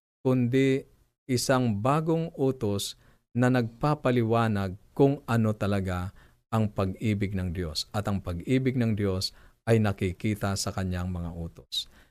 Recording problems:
none

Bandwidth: 14.5 kHz